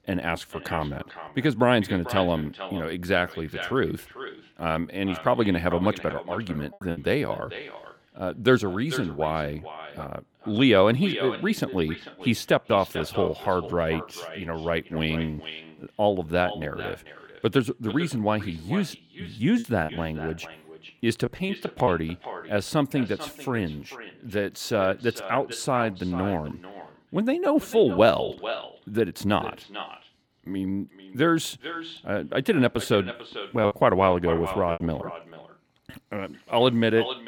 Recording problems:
echo of what is said; noticeable; throughout; 440 ms later, 15 dB below the speech
choppy; very; at 7 s, from 20 to 22 s and from 34 to 36 s; 5% of the speech affected

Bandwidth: 18 kHz